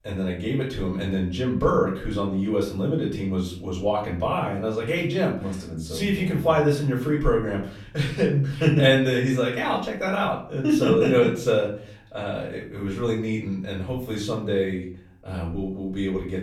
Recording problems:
off-mic speech; far
room echo; slight; dies away in 0.5 s

